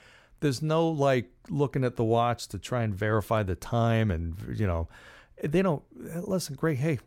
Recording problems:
none

